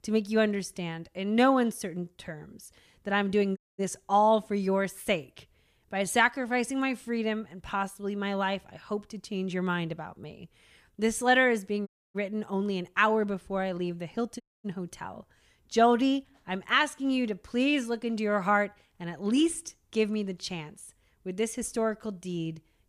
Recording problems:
audio cutting out; at 3.5 s, at 12 s and at 14 s

